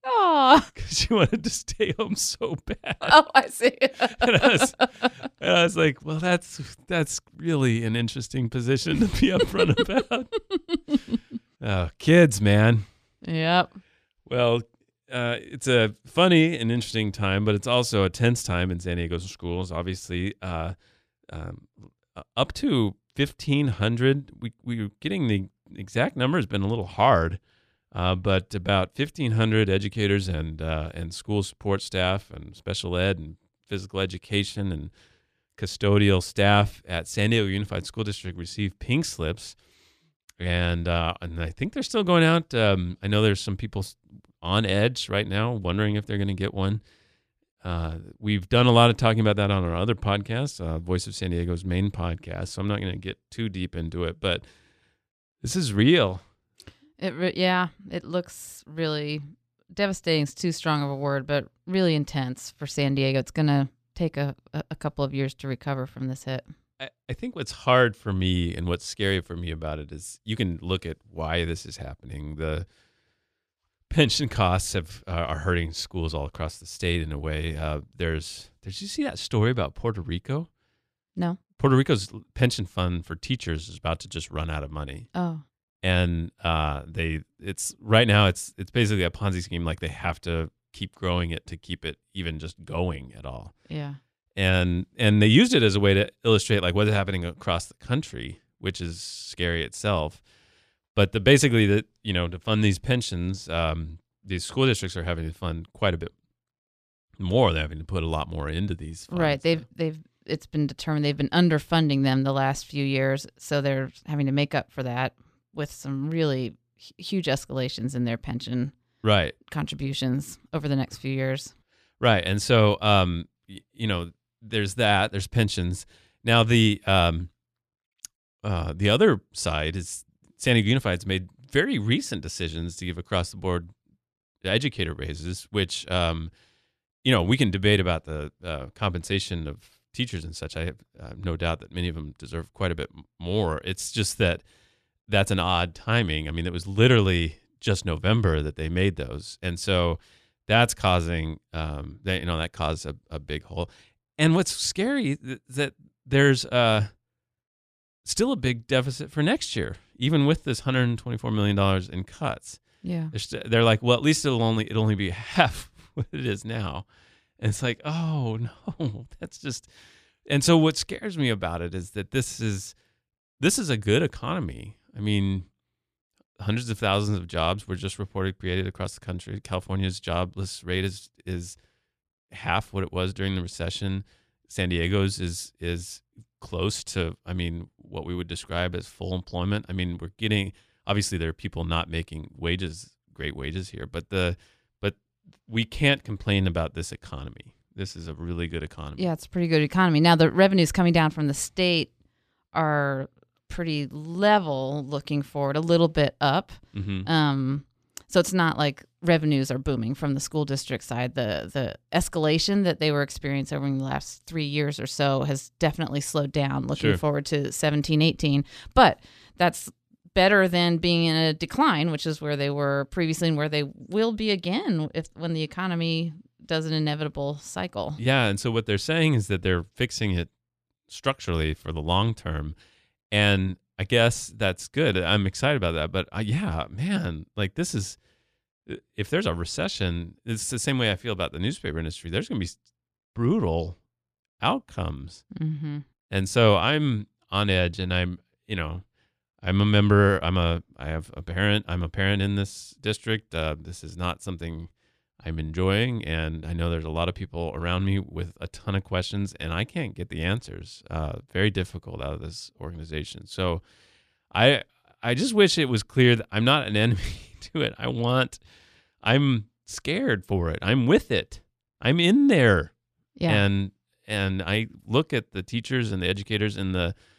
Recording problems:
none

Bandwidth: 14.5 kHz